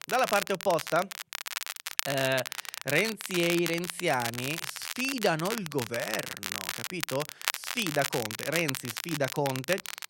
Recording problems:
crackle, like an old record; loud; 4 dB below the speech

